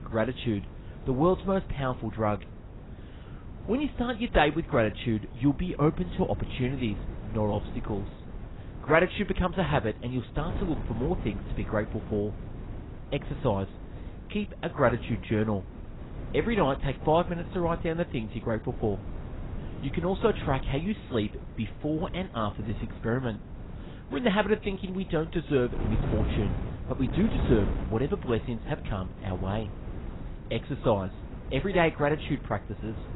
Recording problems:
garbled, watery; badly; nothing above 4 kHz
wind noise on the microphone; occasional gusts; 15 dB below the speech

